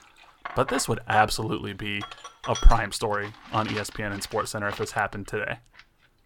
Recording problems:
household noises; noticeable; throughout; 10 dB below the speech

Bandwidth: 18 kHz